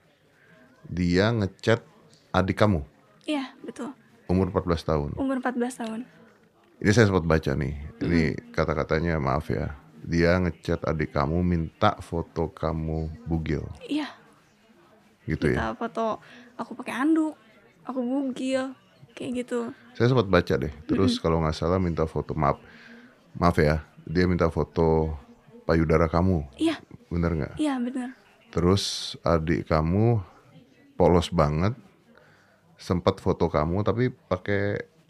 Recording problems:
chatter from many people; faint; throughout; 30 dB below the speech

